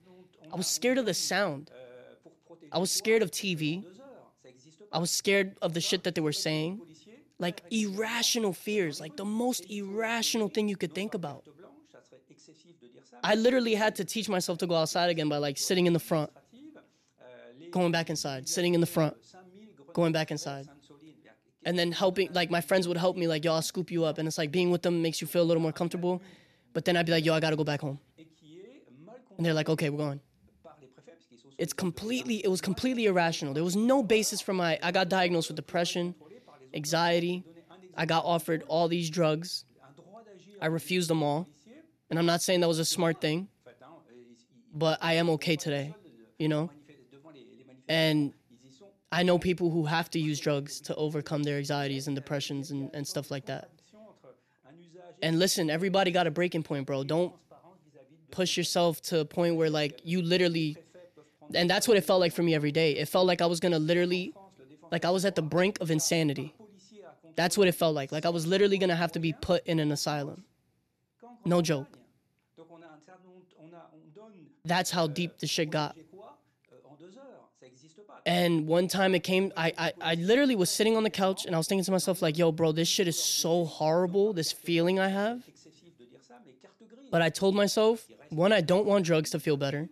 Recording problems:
voice in the background; faint; throughout; 25 dB below the speech

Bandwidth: 13.5 kHz